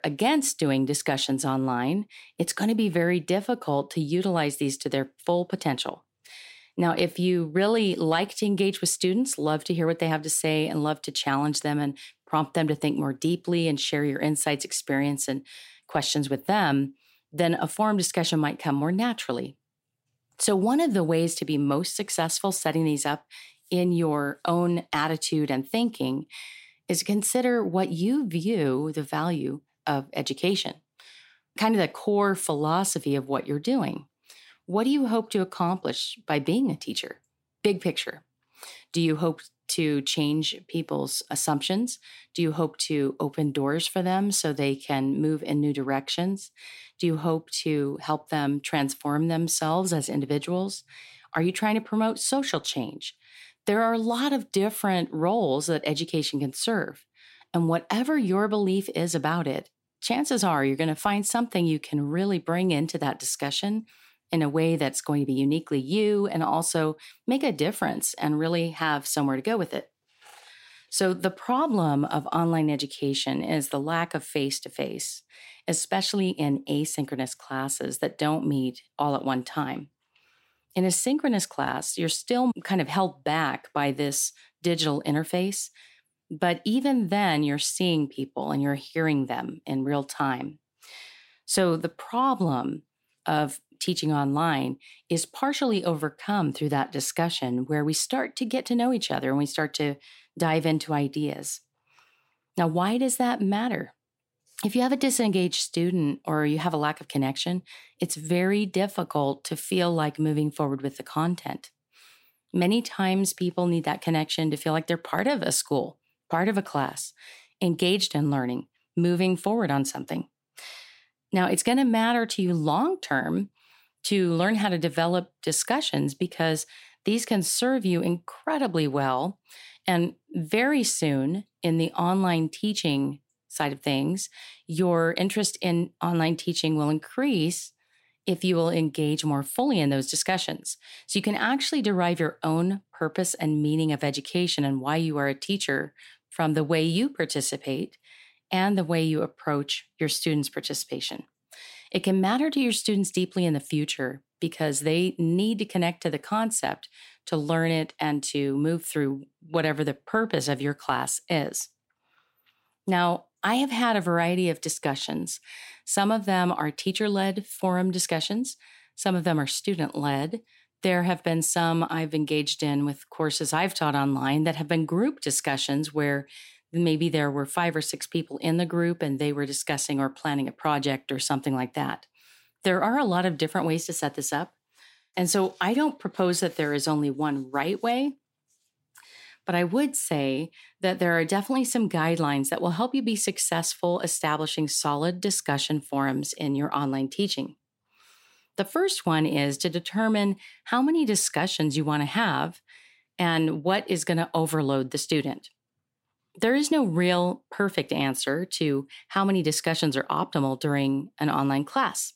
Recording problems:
none

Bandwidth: 16 kHz